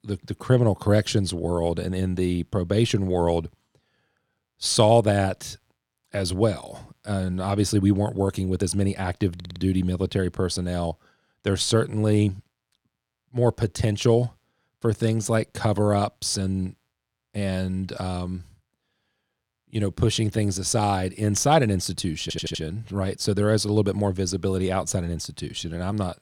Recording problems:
audio stuttering; at 9.5 s and at 22 s

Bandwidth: 18.5 kHz